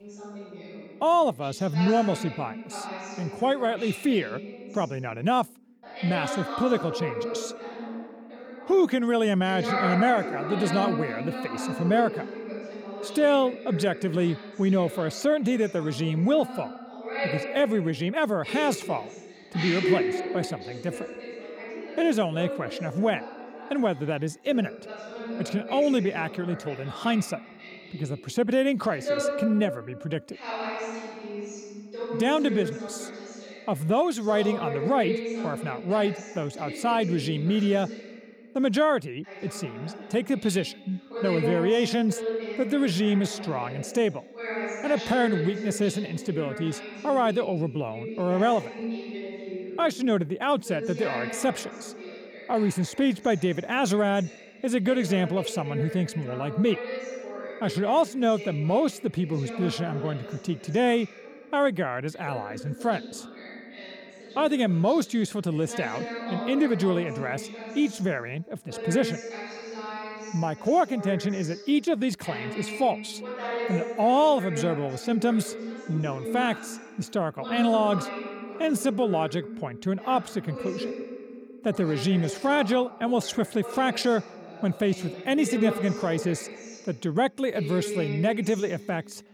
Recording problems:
voice in the background; loud; throughout; 9 dB below the speech

